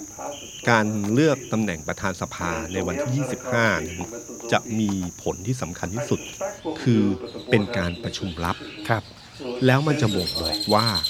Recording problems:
animal sounds; loud; throughout; 10 dB below the speech
voice in the background; loud; throughout; 9 dB below the speech

